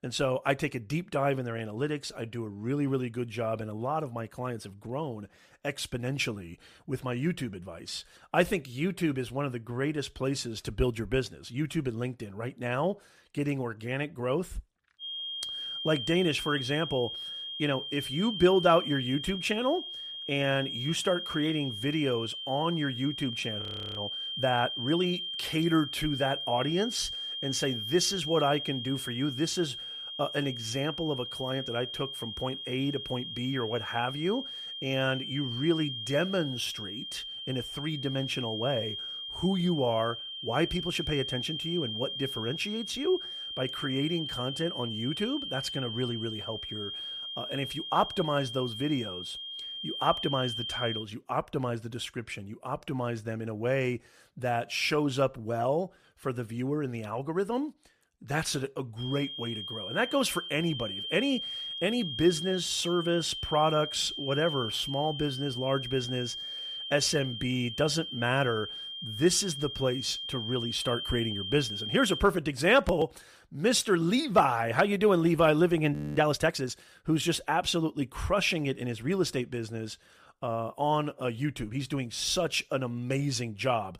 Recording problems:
high-pitched whine; loud; from 15 to 51 s and from 59 s to 1:12; 3 kHz, 5 dB below the speech
audio freezing; at 24 s and at 1:16

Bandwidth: 14.5 kHz